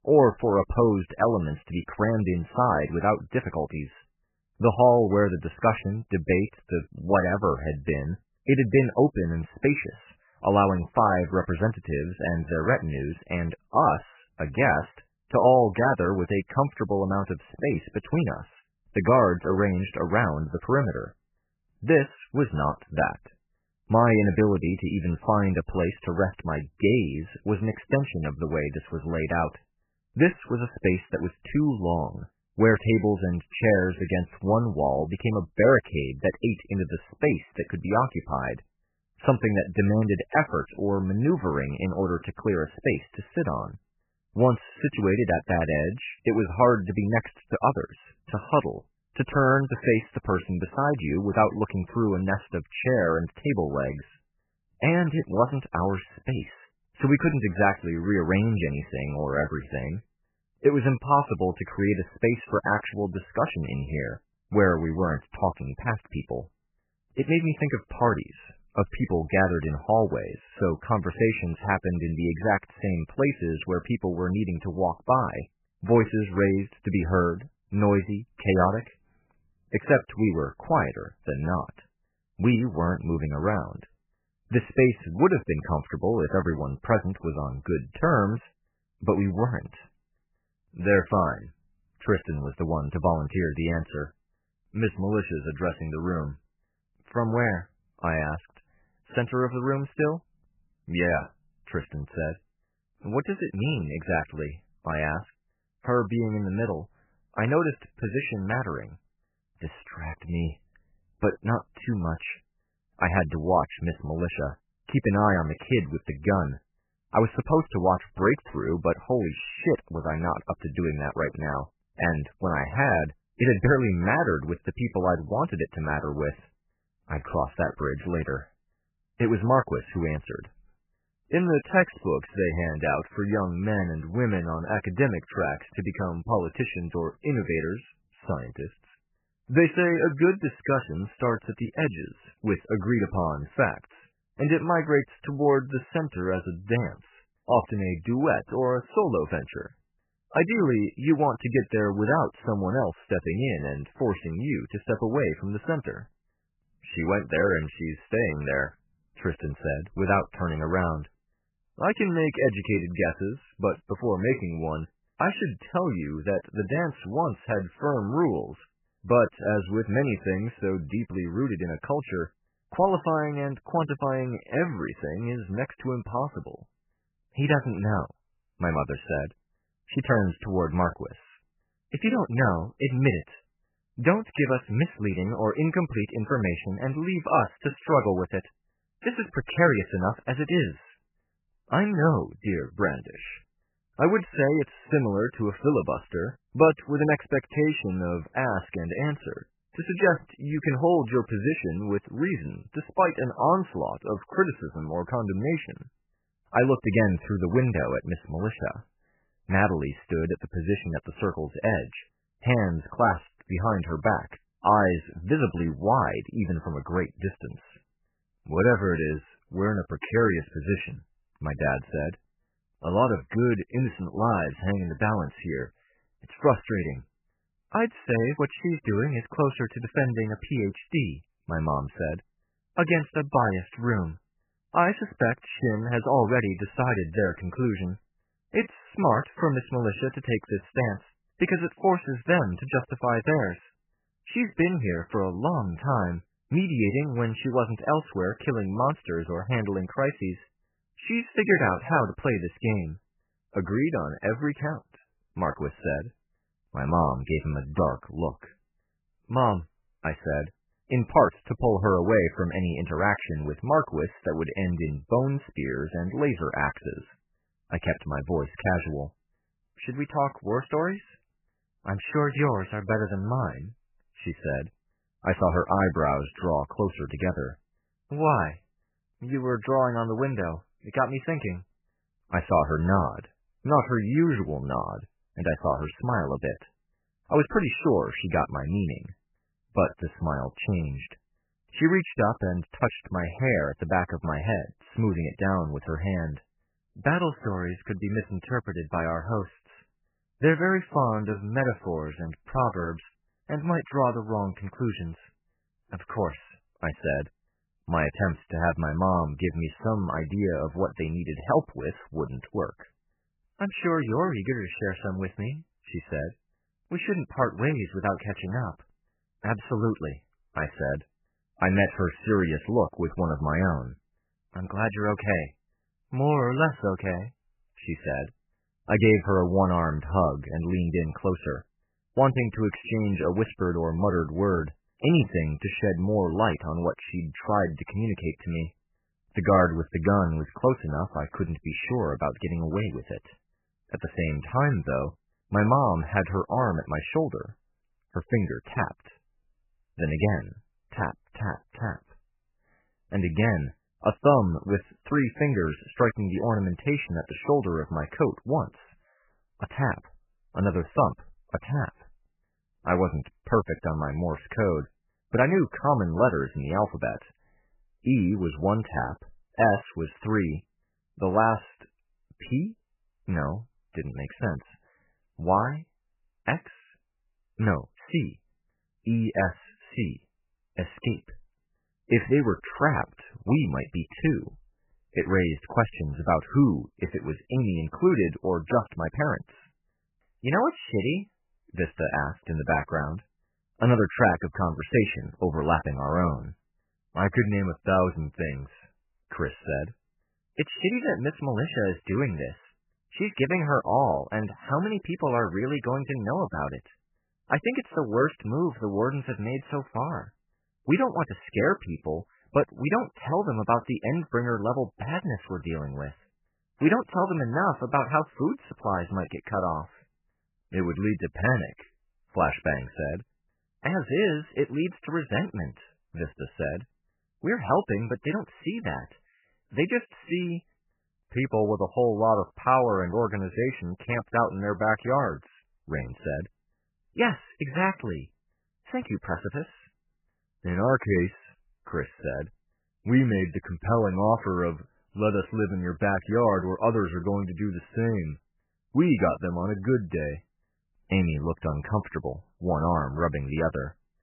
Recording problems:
garbled, watery; badly; nothing above 3 kHz

